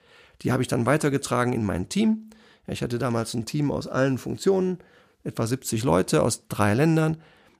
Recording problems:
none

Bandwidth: 15 kHz